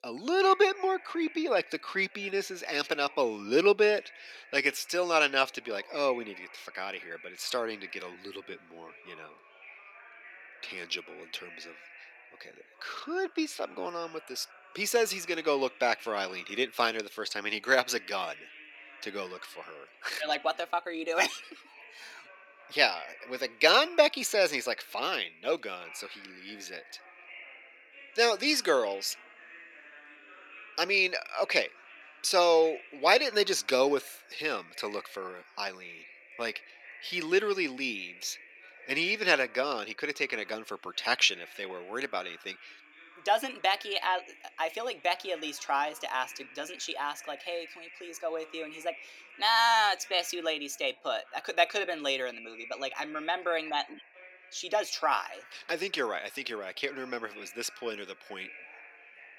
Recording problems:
thin; somewhat; fading below 400 Hz
background chatter; faint; throughout; 2 voices, 20 dB below the speech

